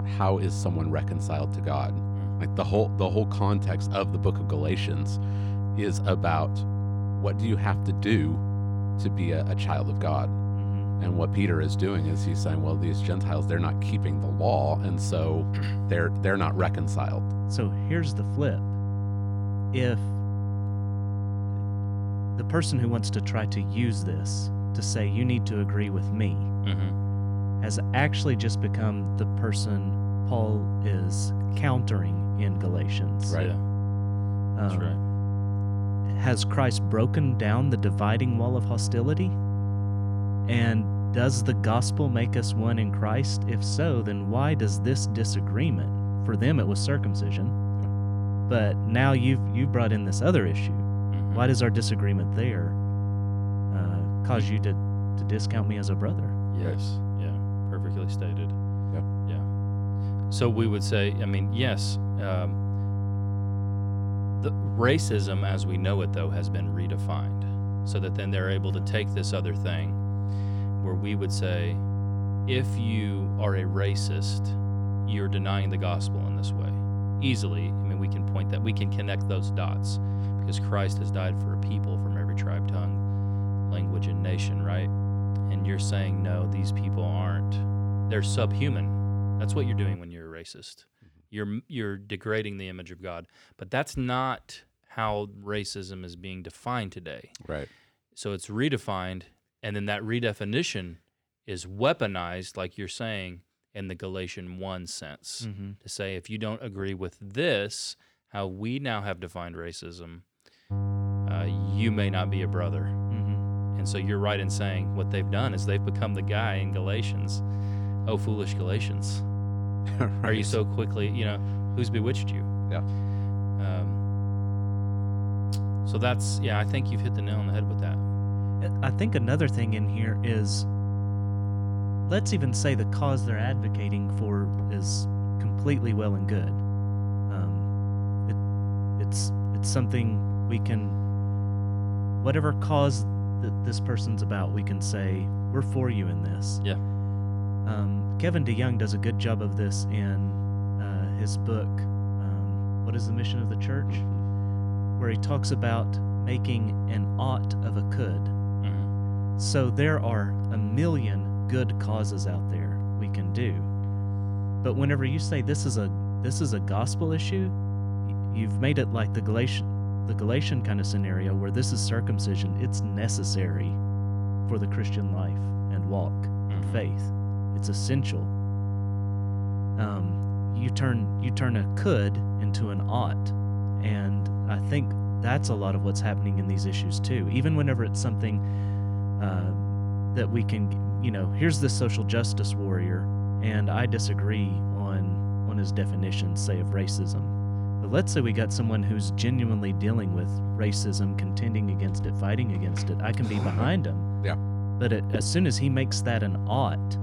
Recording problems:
electrical hum; loud; until 1:30 and from 1:51 on; 50 Hz, 7 dB below the speech

